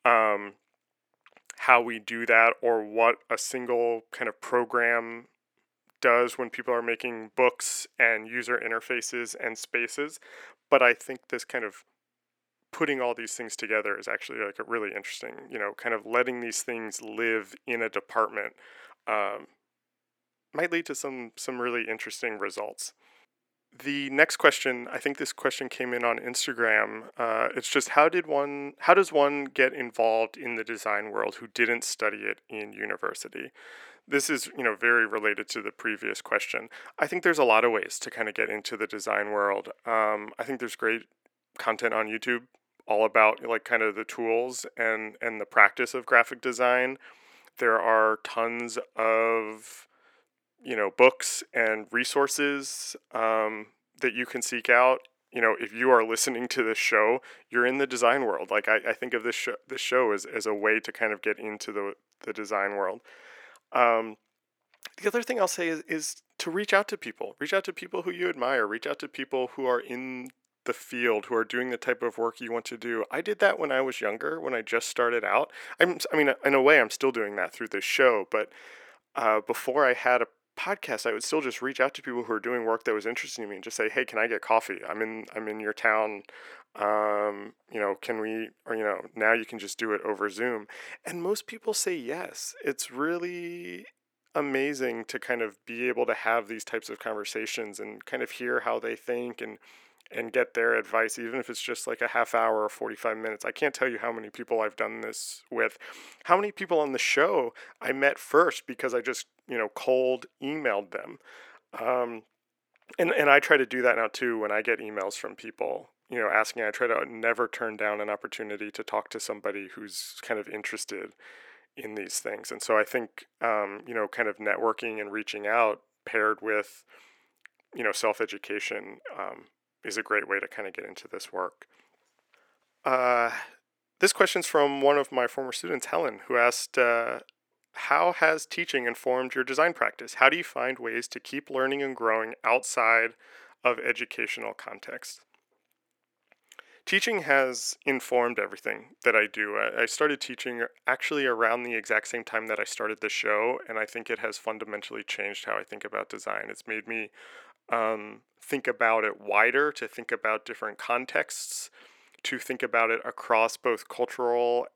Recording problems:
thin; somewhat; fading below 350 Hz

